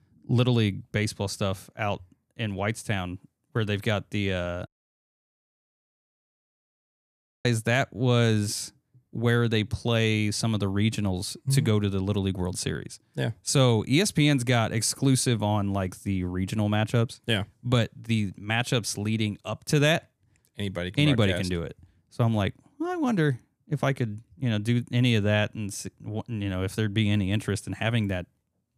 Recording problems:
audio cutting out; at 4.5 s for 3 s

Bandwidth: 14.5 kHz